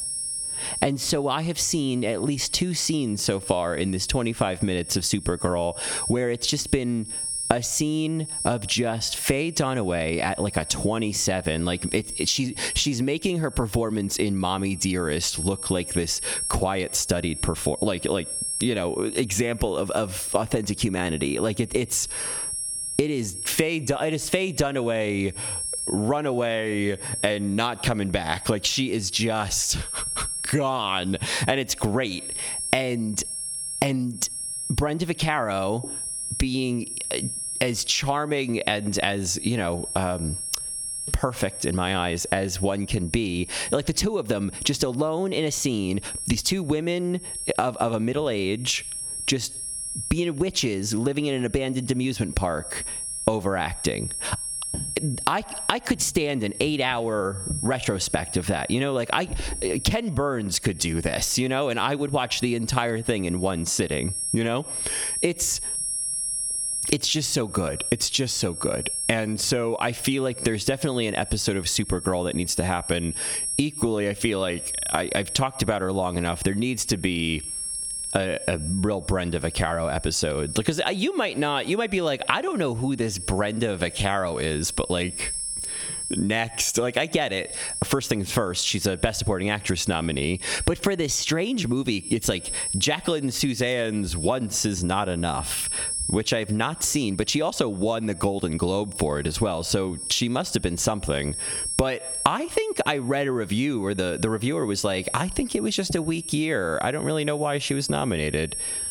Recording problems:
squashed, flat; heavily
high-pitched whine; loud; throughout; 10.5 kHz, 7 dB below the speech

